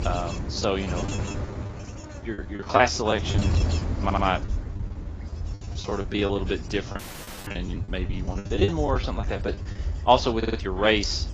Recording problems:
garbled, watery; badly
wind noise on the microphone; occasional gusts; 15 dB below the speech
choppy; very; from 0.5 to 3.5 s, at 6 s and from 7 to 10 s; 18% of the speech affected
audio stuttering; at 4 s and at 10 s
audio cutting out; at 7 s for 0.5 s

